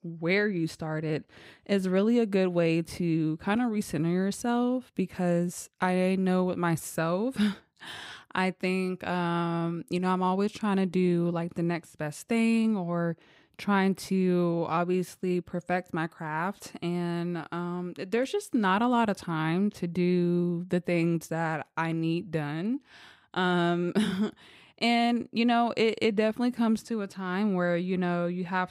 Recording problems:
none

